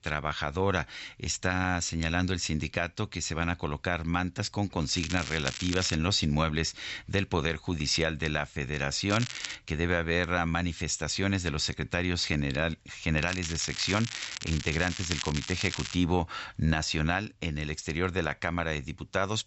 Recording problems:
high frequencies cut off; noticeable; nothing above 7.5 kHz
crackling; loud; from 5 to 6 s, at 9 s and from 13 to 16 s; 7 dB below the speech

